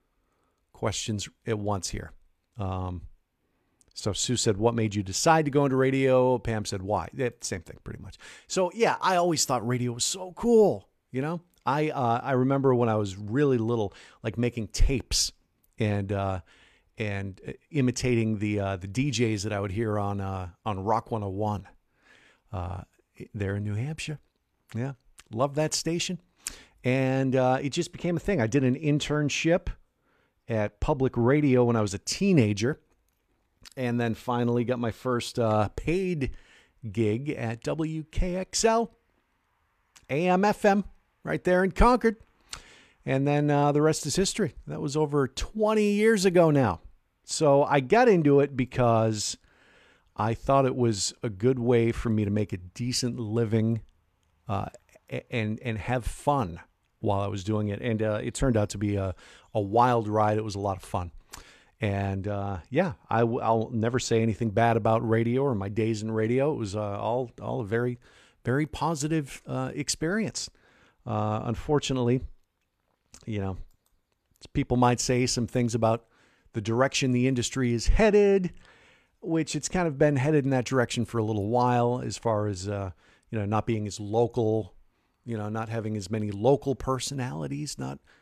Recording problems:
none

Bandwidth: 14.5 kHz